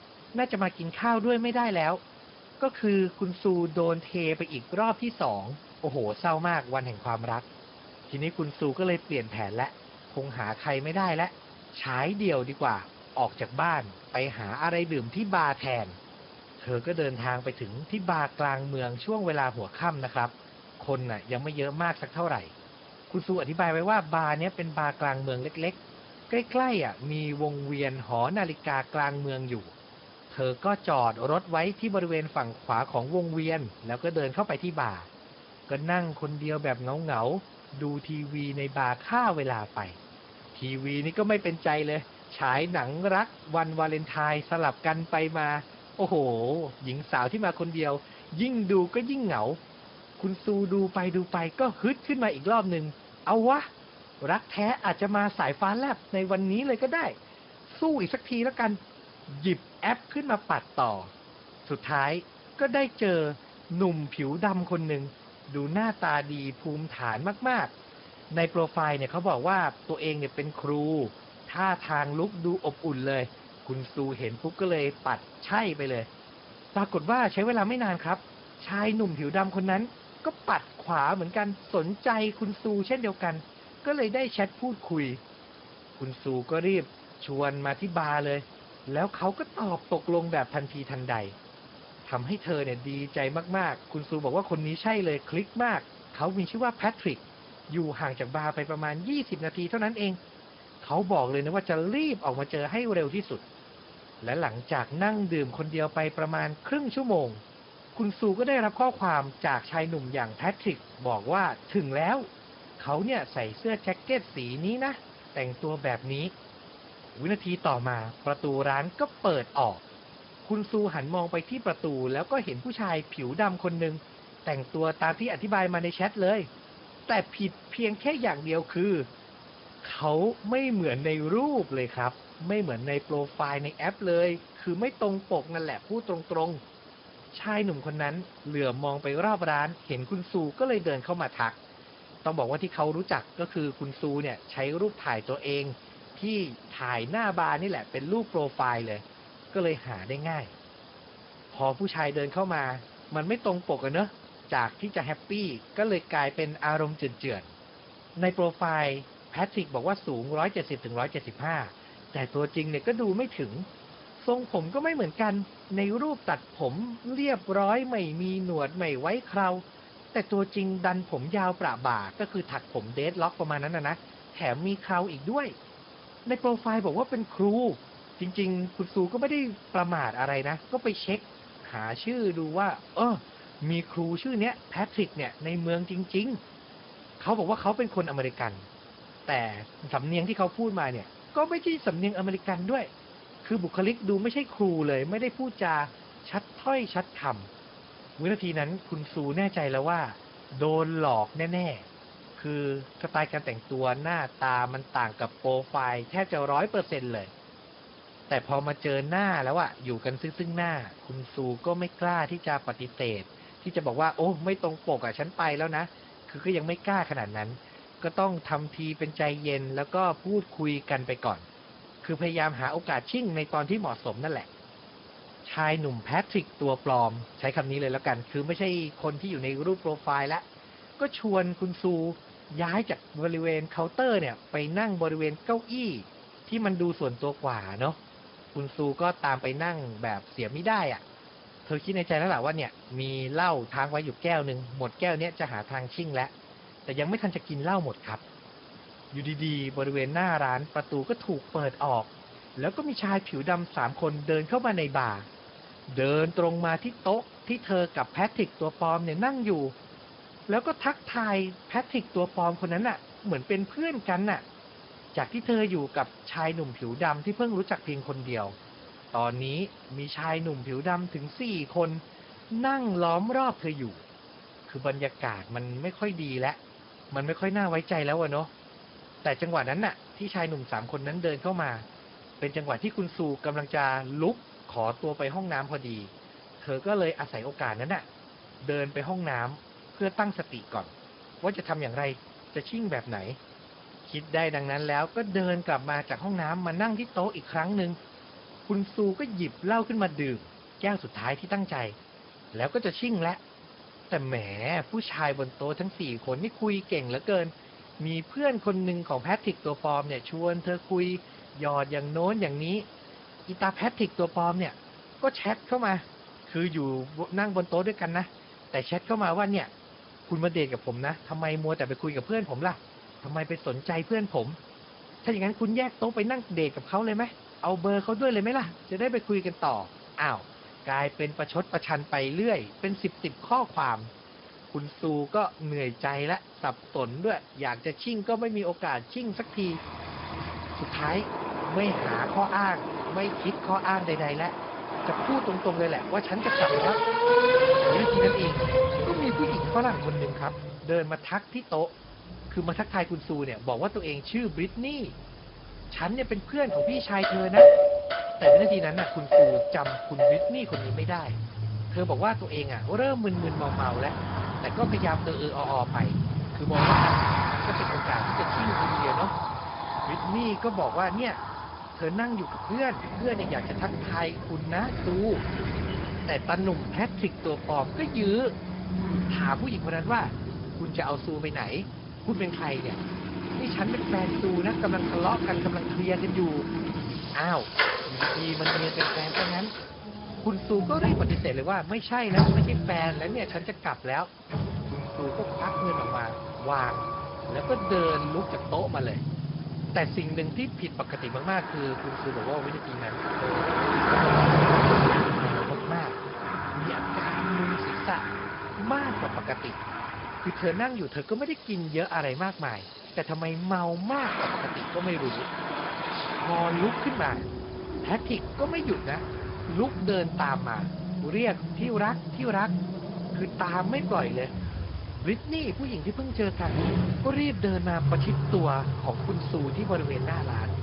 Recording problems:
garbled, watery; badly
high frequencies cut off; noticeable; nothing above 5 kHz
traffic noise; very loud; from 5:40 on; 2 dB above the speech
hiss; noticeable; throughout; 20 dB below the speech

